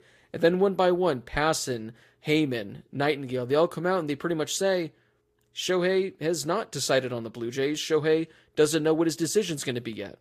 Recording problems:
garbled, watery; slightly; nothing above 14.5 kHz

